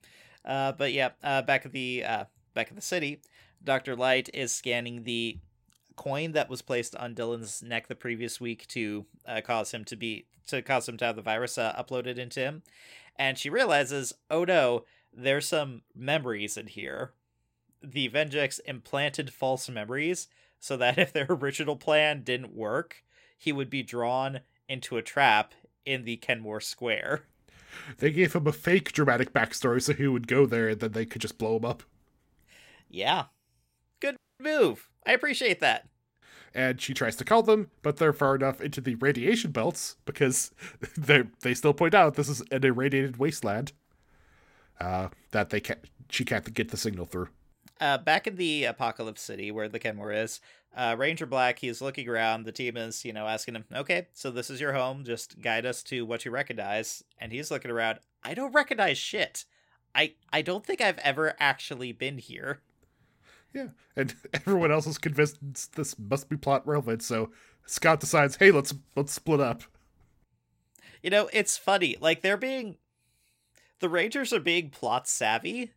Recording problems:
audio cutting out; at 34 s

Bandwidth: 16 kHz